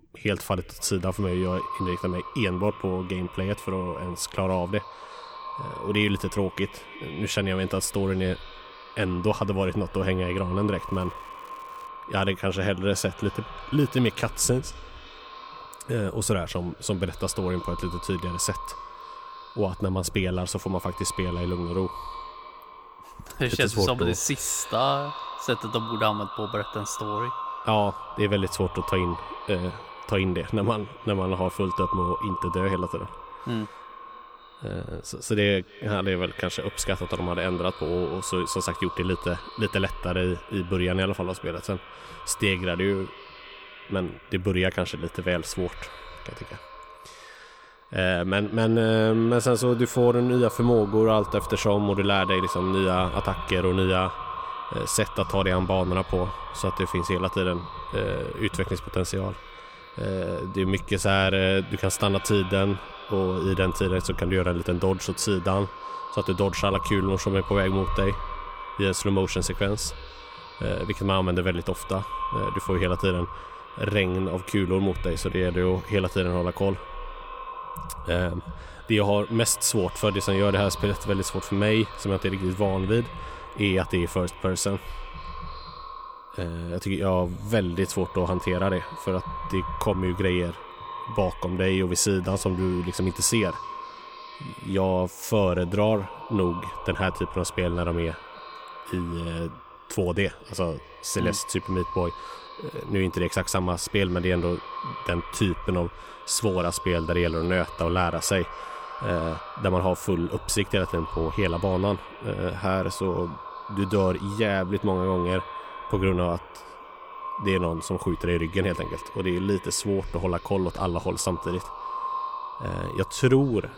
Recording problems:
echo of what is said; strong; throughout; 290 ms later, 10 dB below the speech
crackling; faint; from 11 to 12 s; 30 dB below the speech

